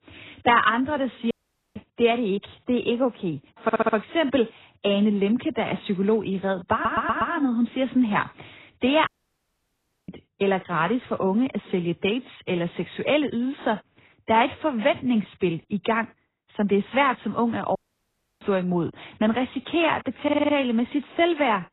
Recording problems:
garbled, watery; badly; nothing above 4 kHz
audio cutting out; at 1.5 s, at 9 s for 1 s and at 18 s for 0.5 s
audio stuttering; at 3.5 s, at 6.5 s and at 20 s

